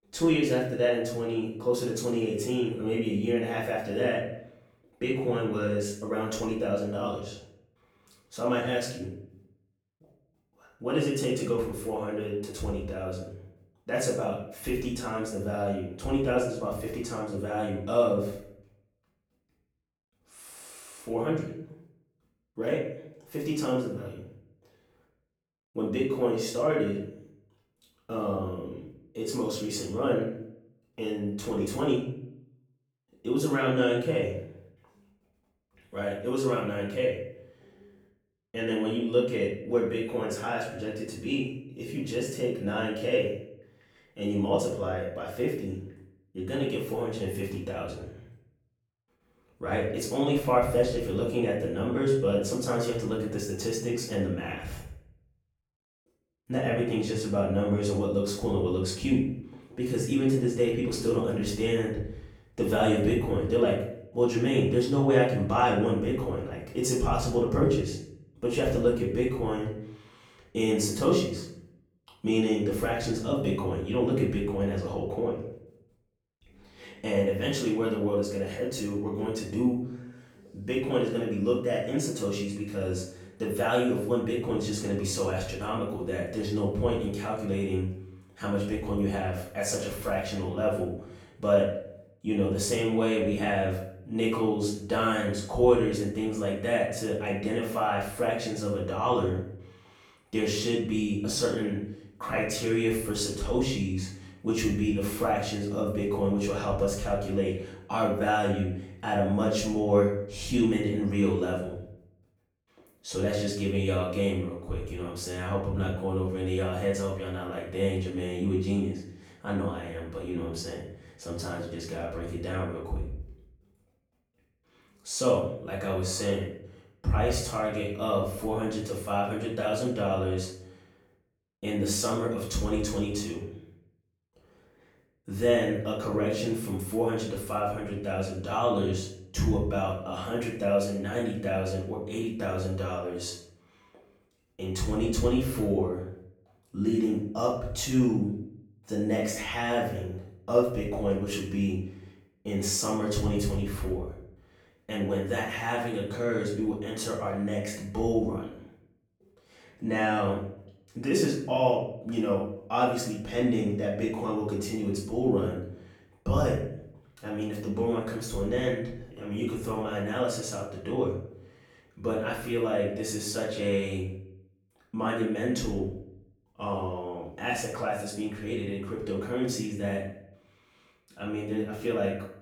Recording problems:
off-mic speech; far
room echo; noticeable; dies away in 0.6 s

